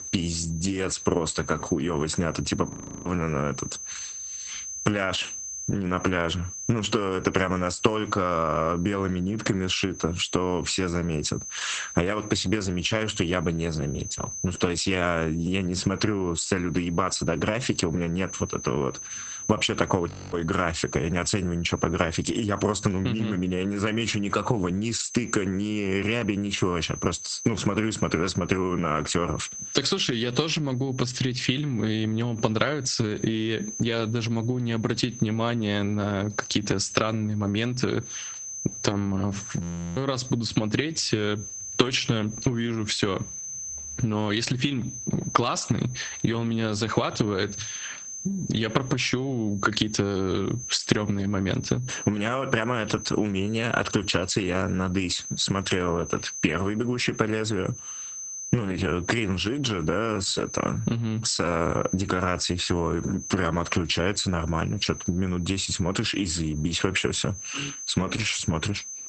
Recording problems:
garbled, watery; badly; nothing above 8 kHz
squashed, flat; heavily
high-pitched whine; noticeable; throughout; 6 kHz, 10 dB below the speech
audio freezing; at 2.5 s, at 20 s and at 40 s

